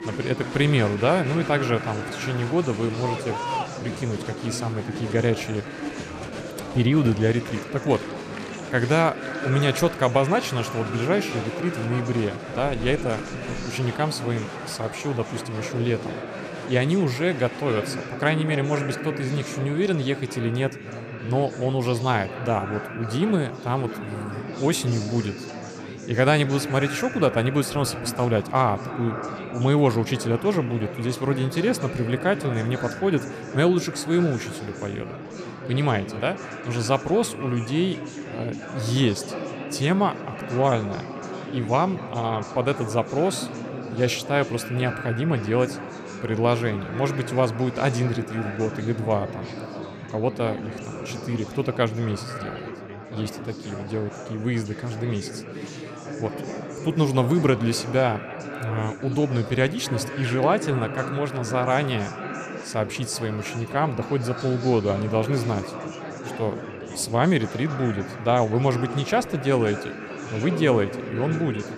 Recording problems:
echo of what is said; noticeable; throughout; 230 ms later, 15 dB below the speech
chatter from many people; loud; throughout; 10 dB below the speech

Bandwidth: 14.5 kHz